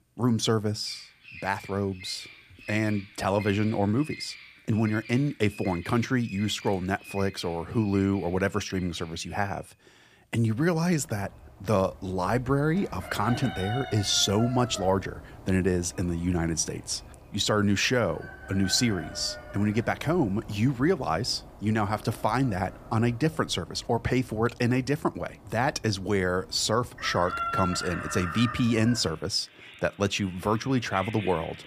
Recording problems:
animal sounds; noticeable; throughout; 15 dB below the speech

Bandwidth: 15 kHz